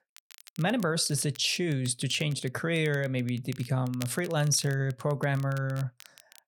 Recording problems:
crackle, like an old record; faint; 20 dB below the speech

